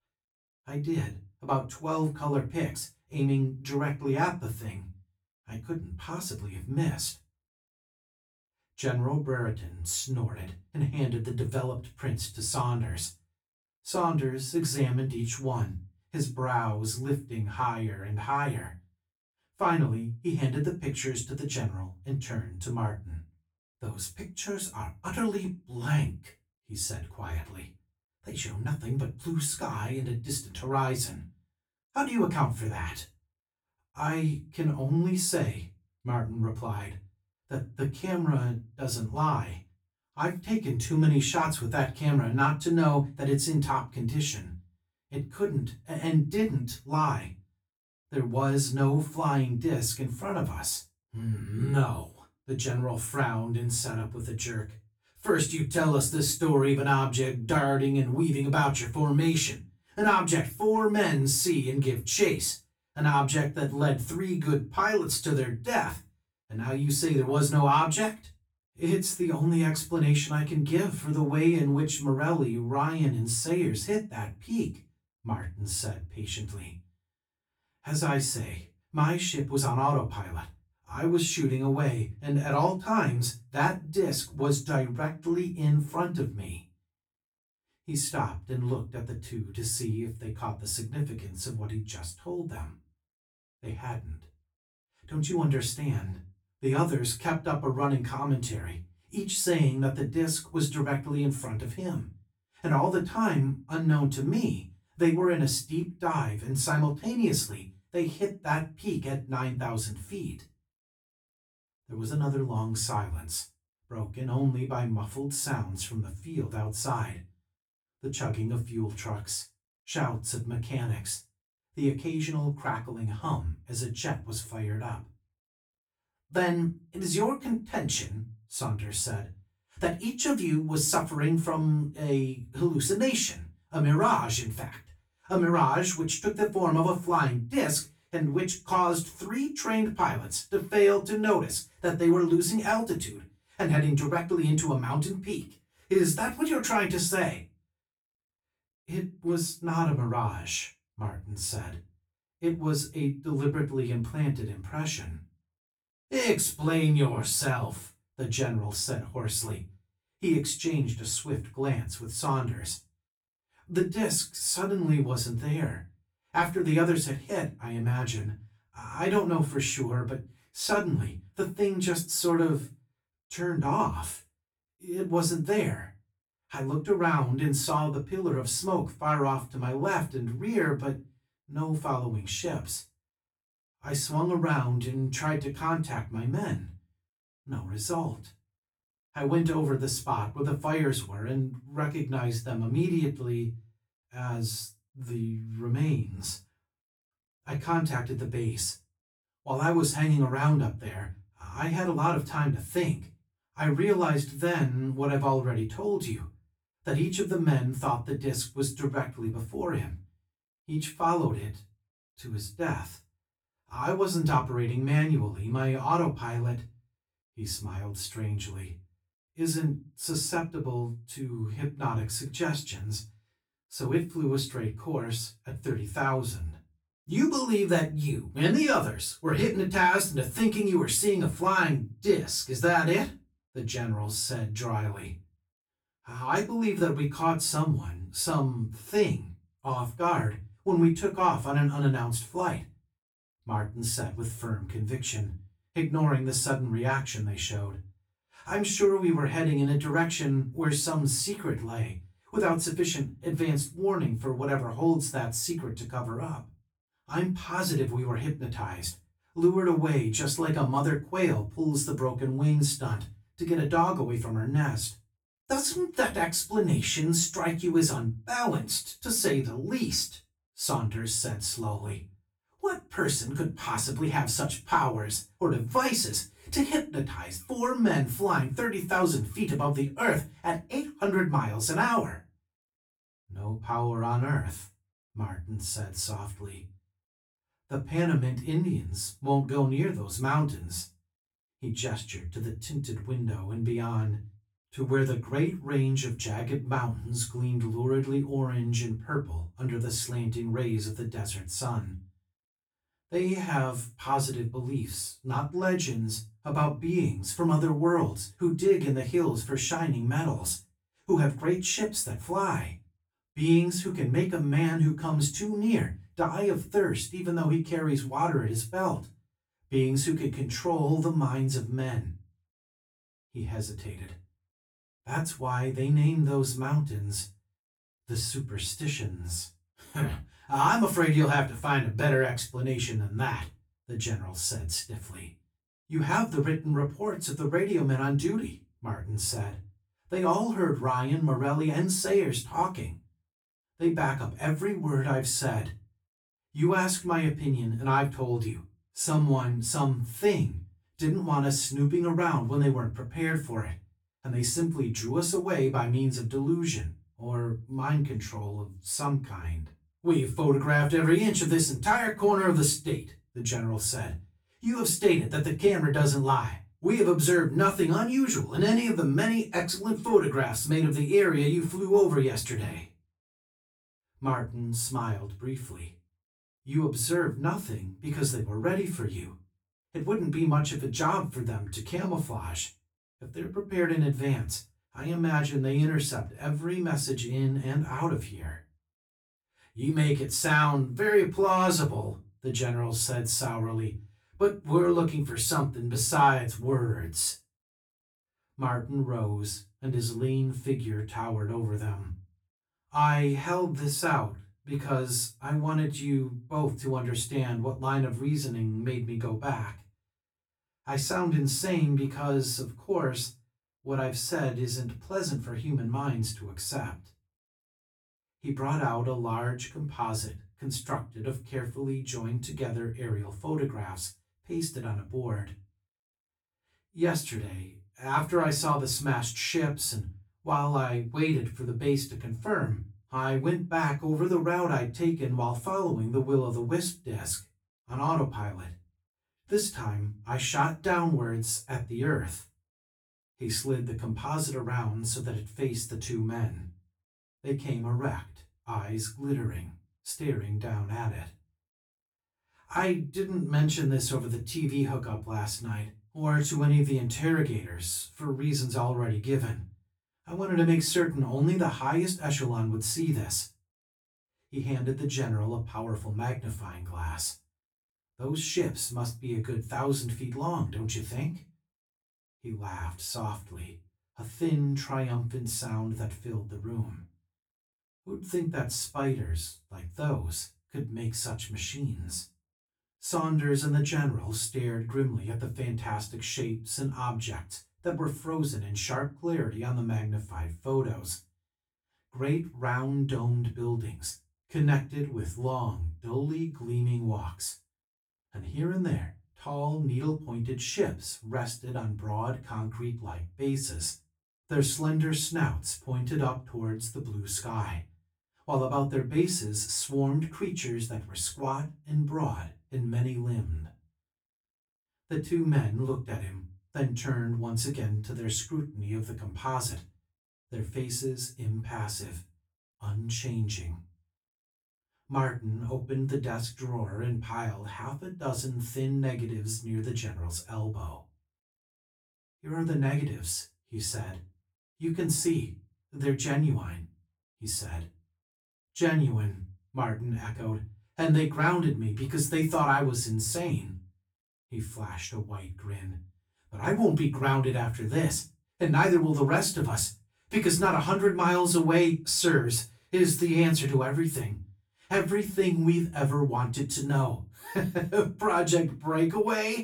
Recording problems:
off-mic speech; far
room echo; very slight; dies away in 0.2 s

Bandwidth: 18.5 kHz